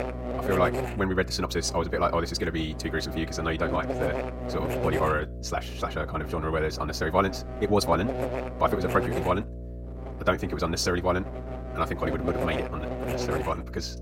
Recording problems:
wrong speed, natural pitch; too fast; 1.6 times normal speed
electrical hum; loud; throughout; 60 Hz, 7 dB below the speech

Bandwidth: 16 kHz